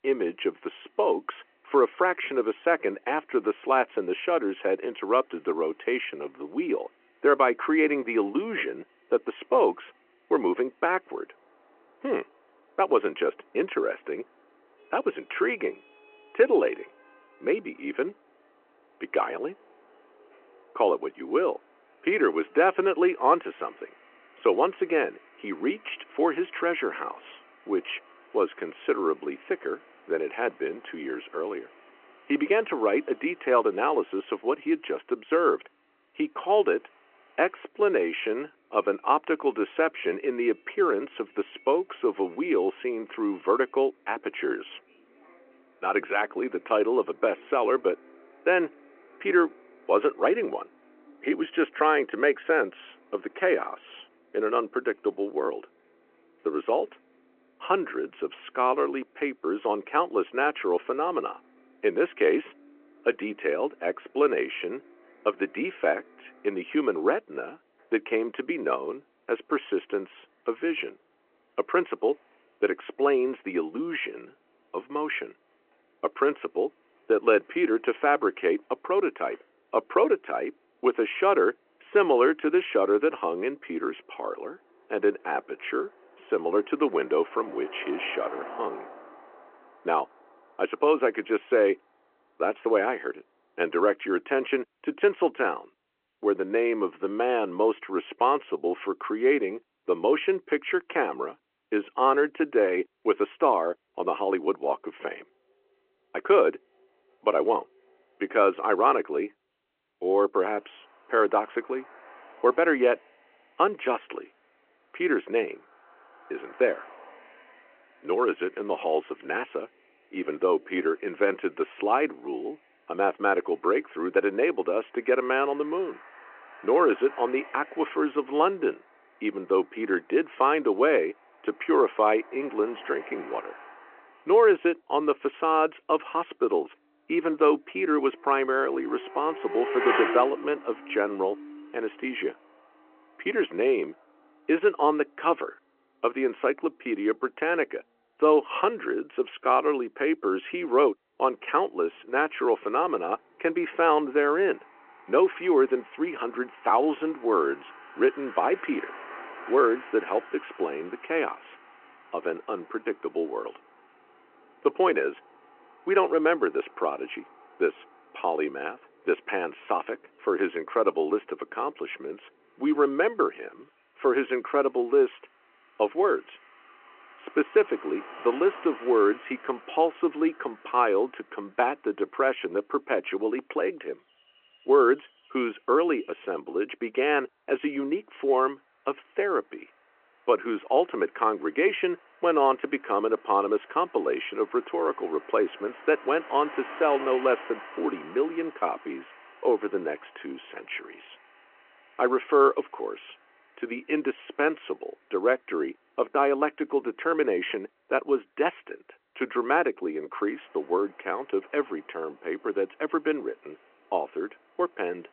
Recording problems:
phone-call audio
traffic noise; noticeable; throughout; 20 dB below the speech

